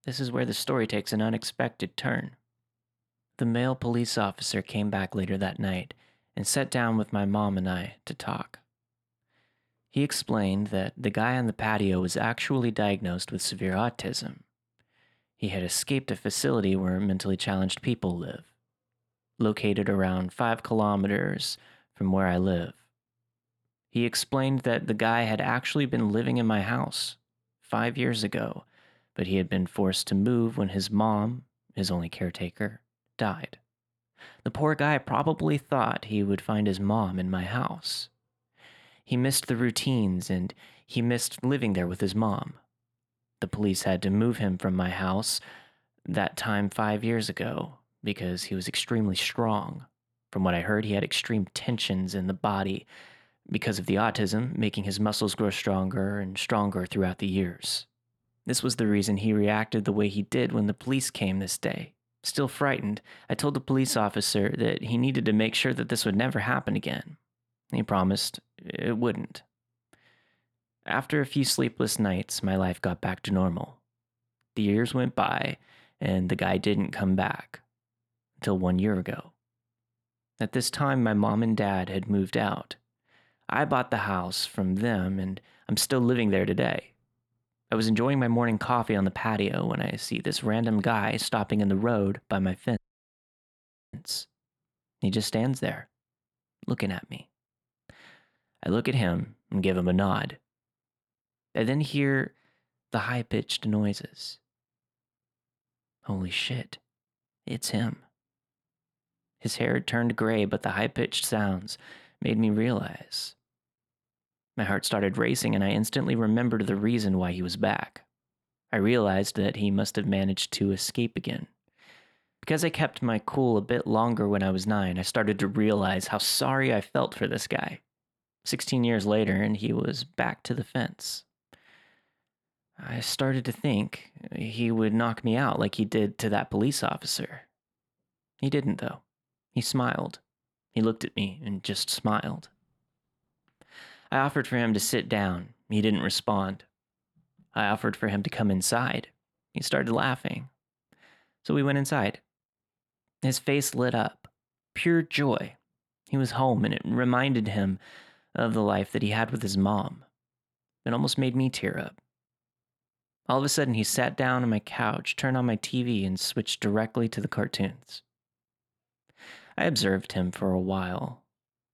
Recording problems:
audio cutting out; at 1:33 for 1 s

